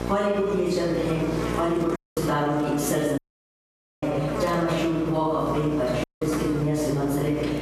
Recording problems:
room echo; strong; dies away in 1.3 s
off-mic speech; far
squashed, flat; somewhat
electrical hum; loud; throughout; 60 Hz, 10 dB below the speech
audio cutting out; at 2 s, at 3 s for 1 s and at 6 s

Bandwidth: 14 kHz